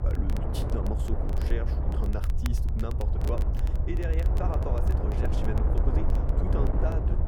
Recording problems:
muffled; slightly; fading above 2.5 kHz
wind noise on the microphone; heavy; as loud as the speech
low rumble; loud; throughout; 7 dB below the speech
crackle, like an old record; noticeable; 15 dB below the speech

